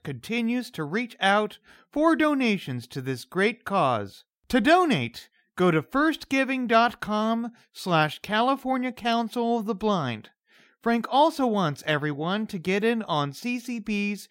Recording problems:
none

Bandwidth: 16 kHz